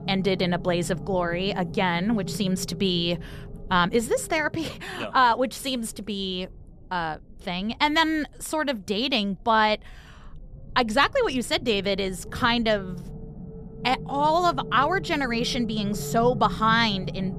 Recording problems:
low rumble; noticeable; throughout; 20 dB below the speech

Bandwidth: 14.5 kHz